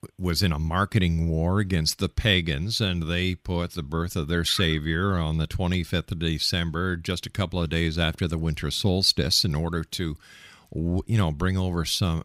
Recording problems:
none

